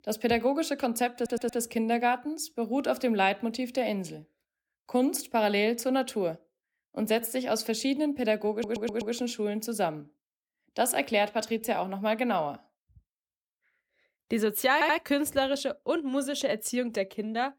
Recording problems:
audio stuttering; at 1 s, at 8.5 s and at 15 s

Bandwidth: 18 kHz